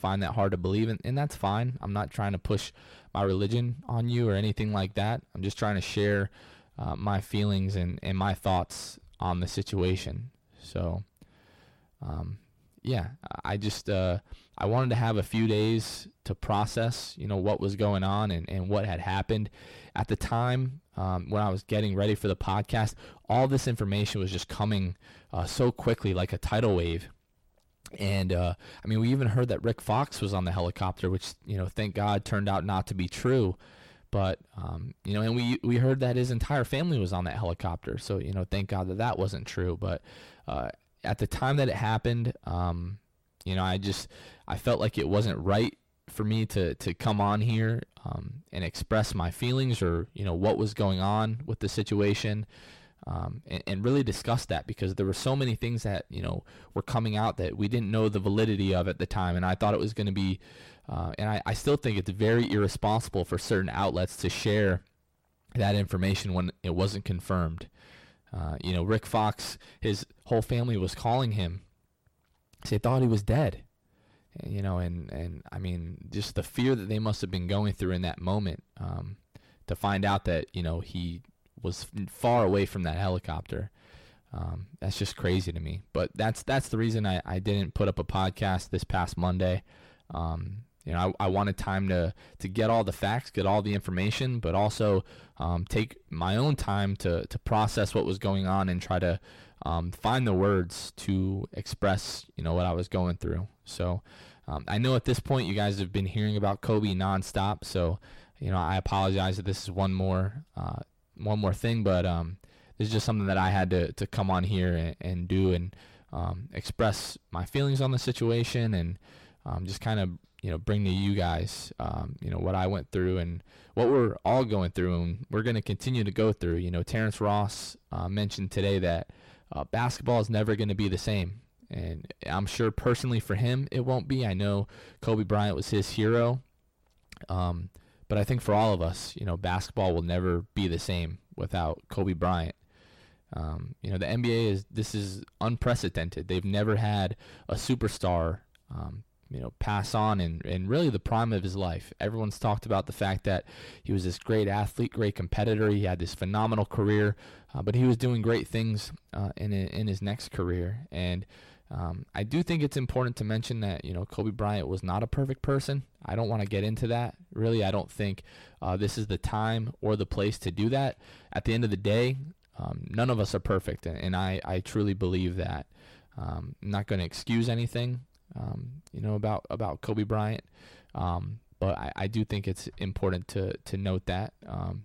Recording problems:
distortion; slight; 10 dB below the speech

